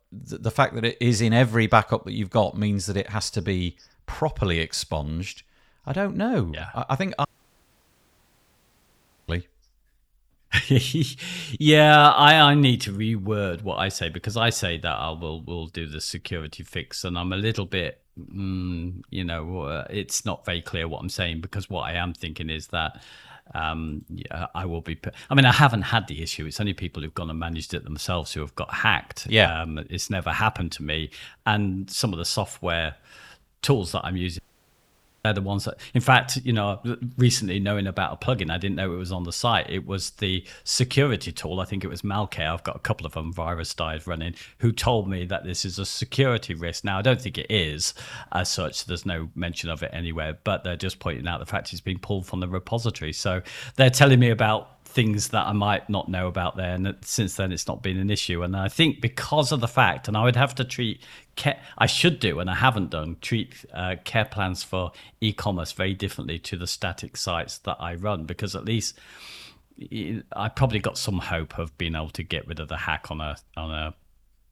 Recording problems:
audio cutting out; at 7.5 s for 2 s and at 34 s for 1 s

